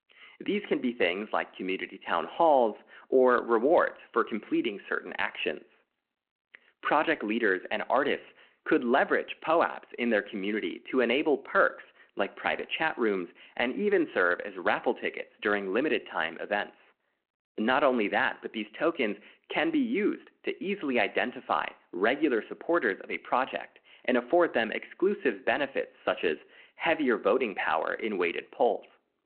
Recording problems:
phone-call audio

